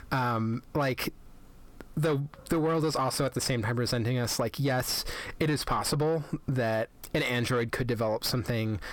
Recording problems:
distortion; slight; 10 dB below the speech
squashed, flat; somewhat

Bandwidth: 17.5 kHz